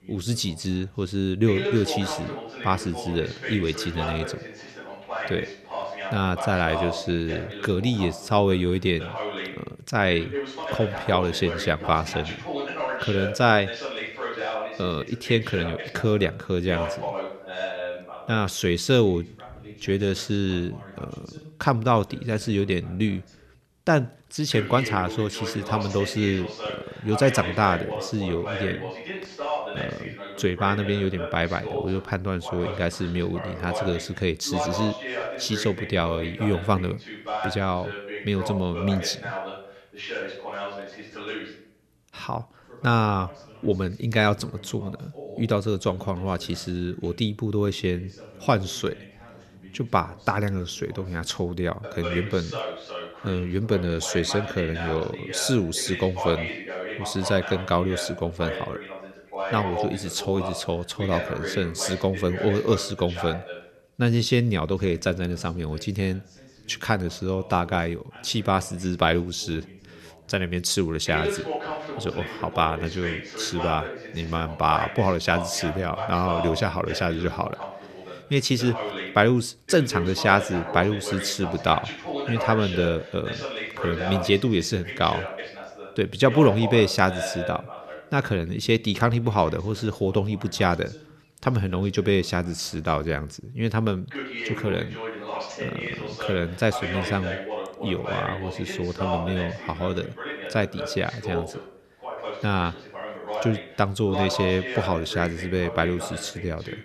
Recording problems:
voice in the background; loud; throughout; 8 dB below the speech

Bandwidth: 13.5 kHz